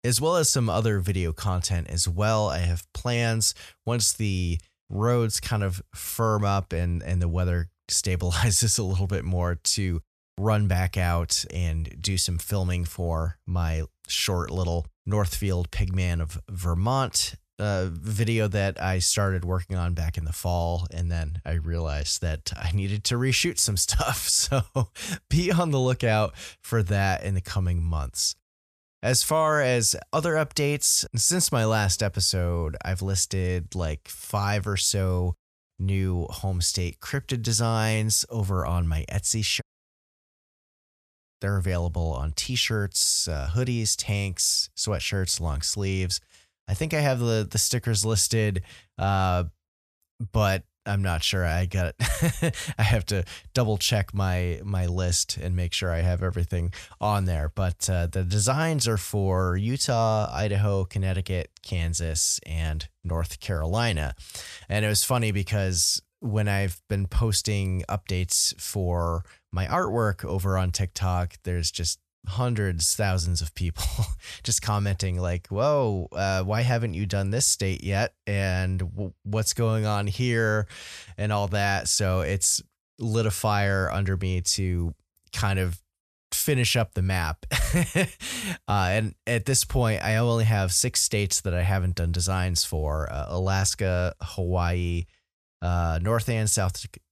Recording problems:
audio cutting out; at 40 s for 1.5 s

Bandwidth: 14.5 kHz